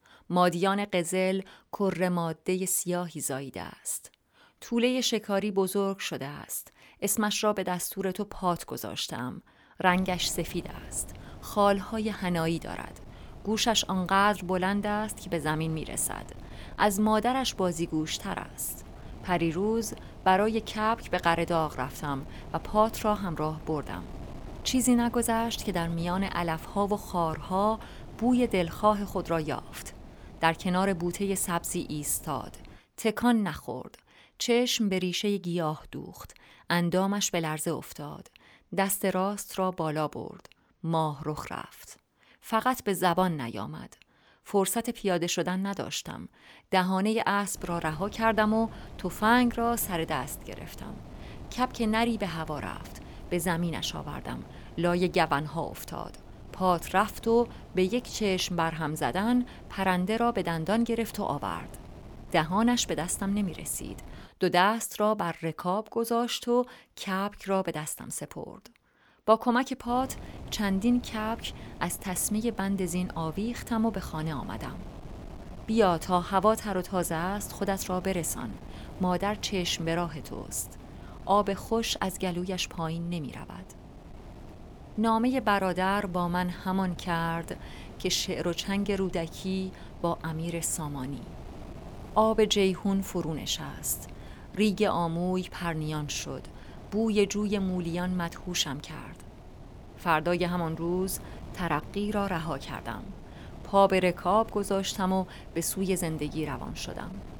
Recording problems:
wind noise on the microphone; occasional gusts; from 10 to 33 s, from 48 s to 1:04 and from 1:10 on; 20 dB below the speech

